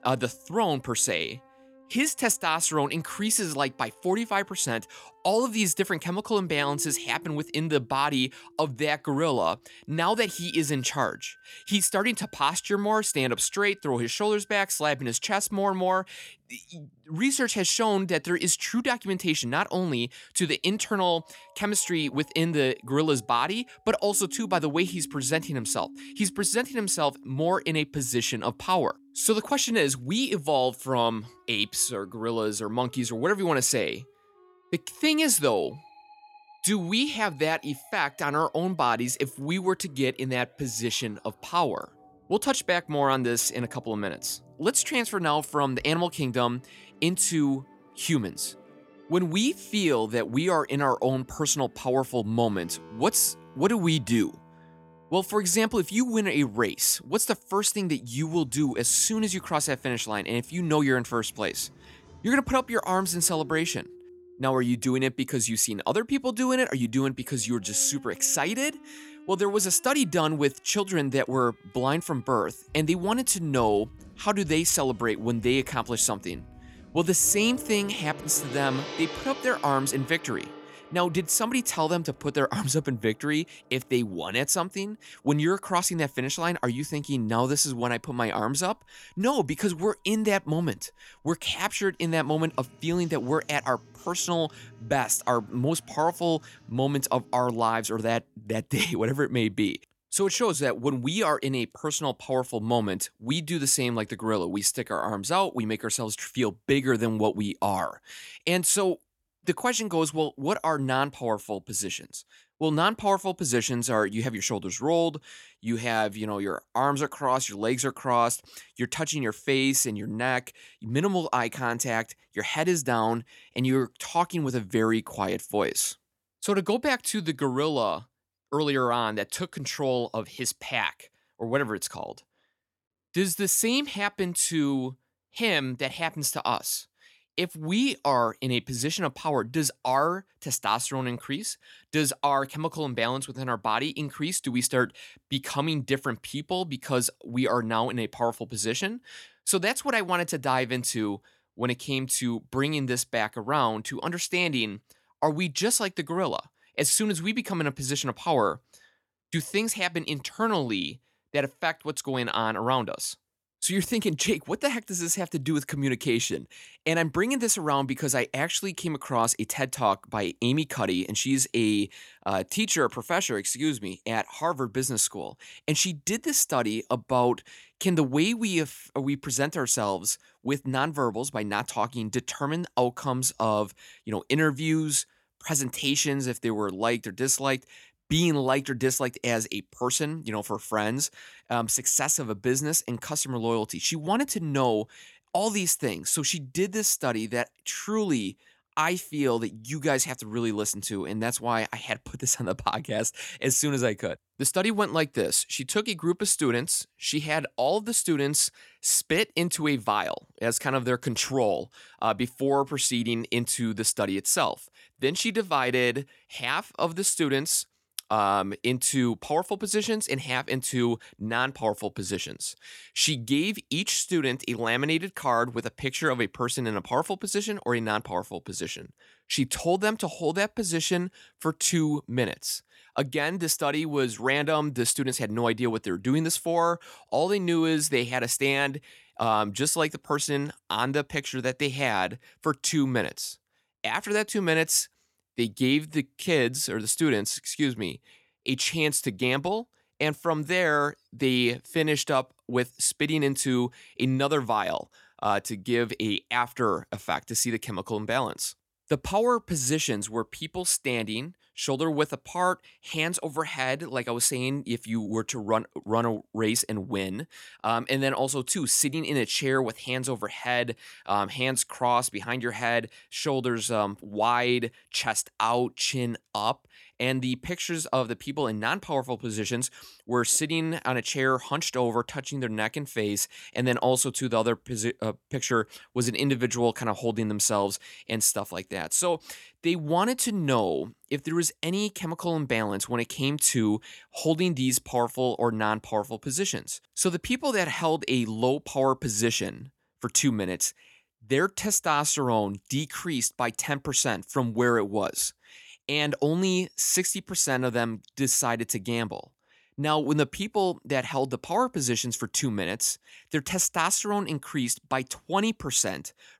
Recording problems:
background music; faint; until 1:38; 20 dB below the speech

